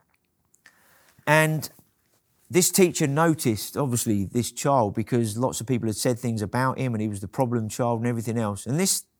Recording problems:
none

